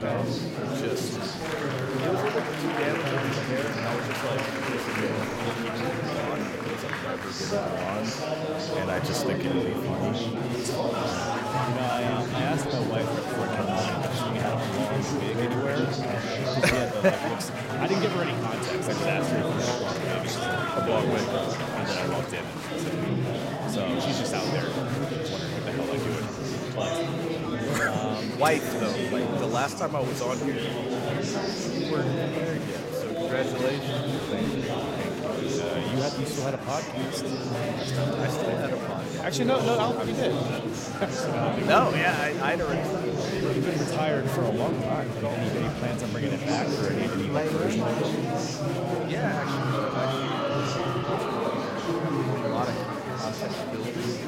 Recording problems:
murmuring crowd; very loud; throughout; 3 dB above the speech
abrupt cut into speech; at the start

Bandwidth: 16 kHz